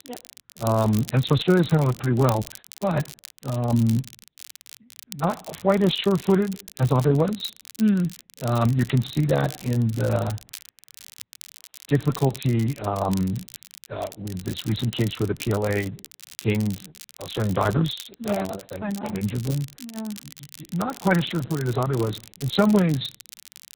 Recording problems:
garbled, watery; badly; nothing above 4 kHz
crackle, like an old record; noticeable; 15 dB below the speech

